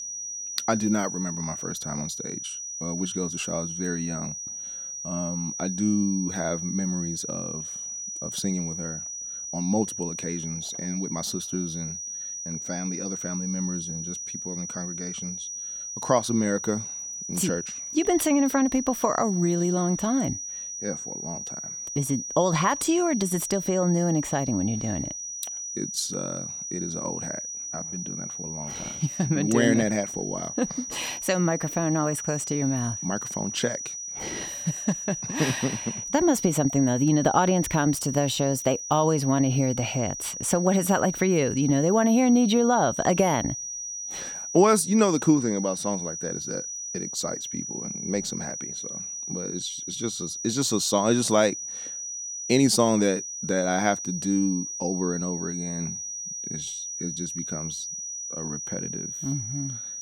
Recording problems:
high-pitched whine; loud; throughout; 6 kHz, 6 dB below the speech

